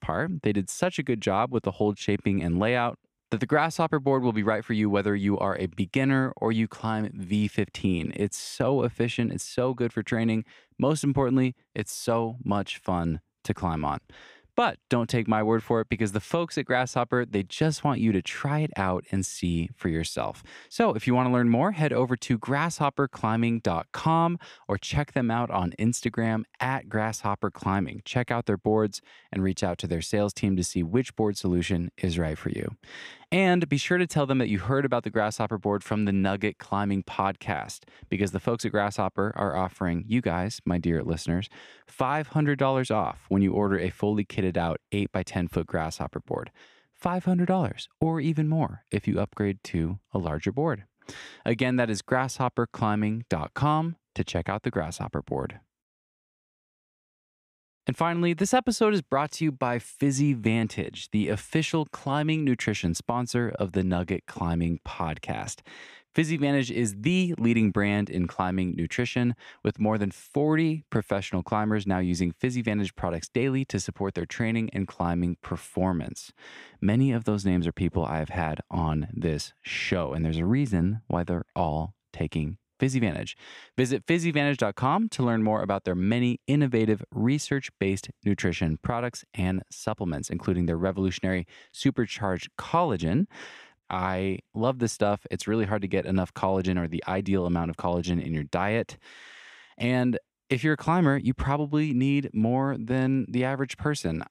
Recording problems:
none

